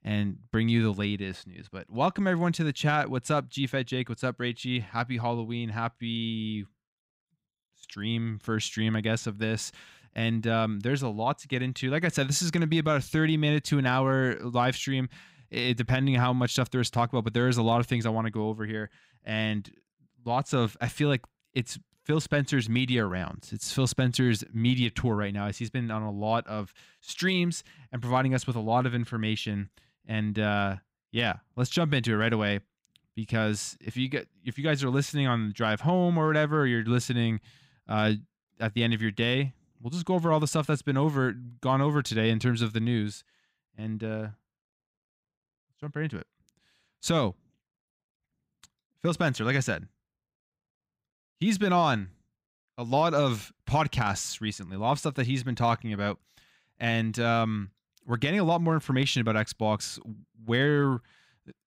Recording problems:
none

